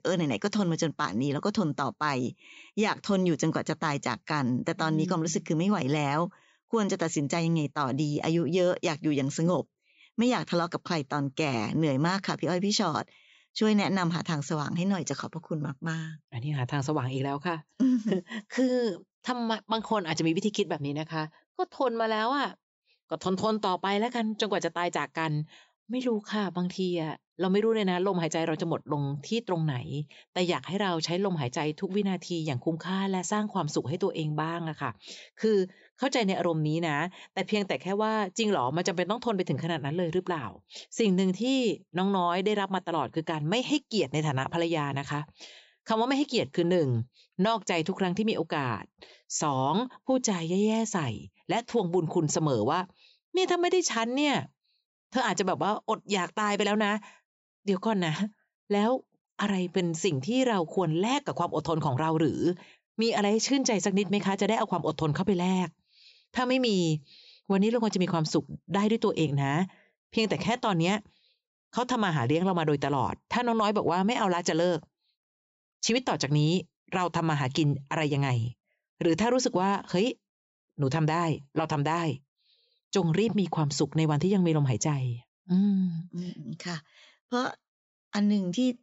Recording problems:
high frequencies cut off; noticeable; nothing above 8 kHz

